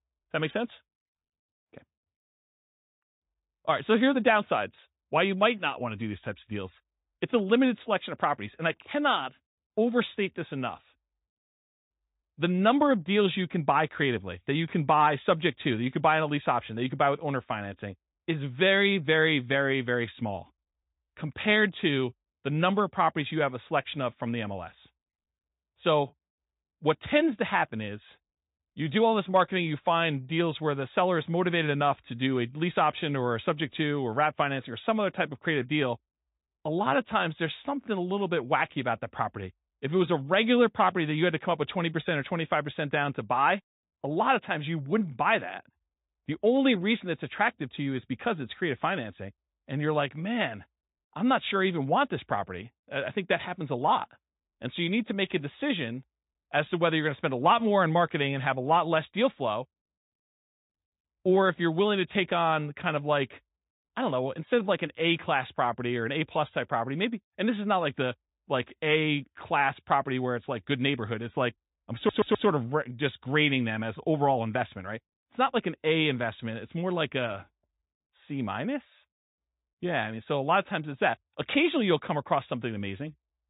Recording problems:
high frequencies cut off; severe; nothing above 4 kHz
garbled, watery; slightly
audio stuttering; at 1:12

